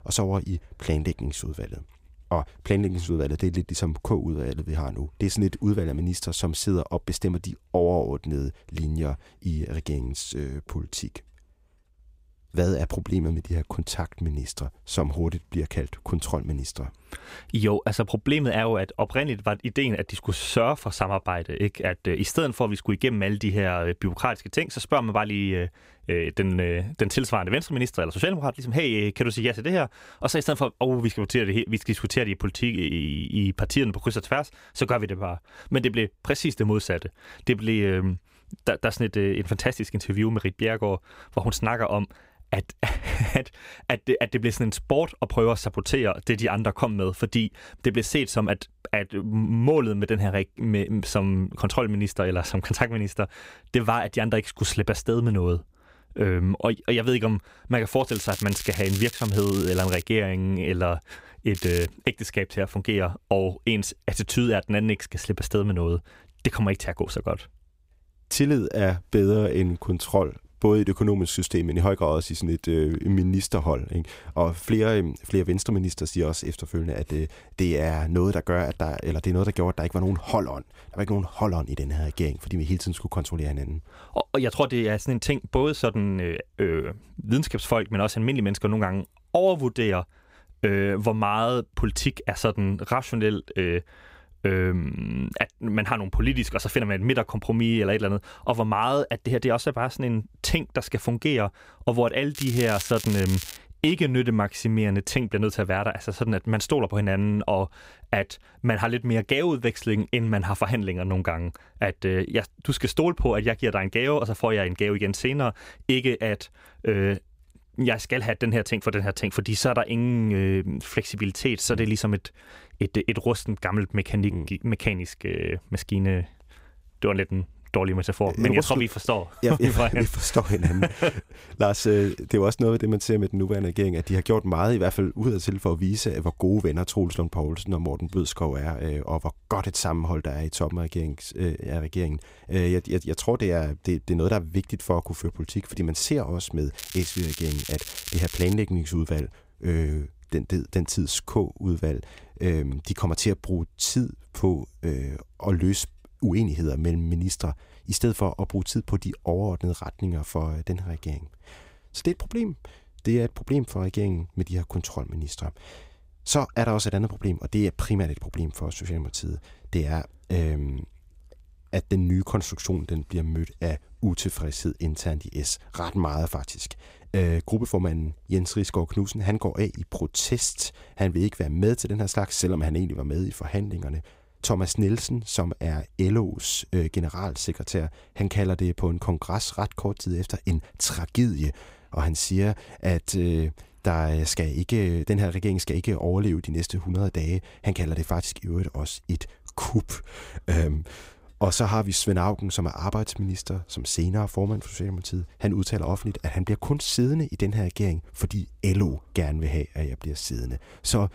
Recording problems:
crackling; loud; 4 times, first at 58 s; 9 dB below the speech

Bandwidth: 15.5 kHz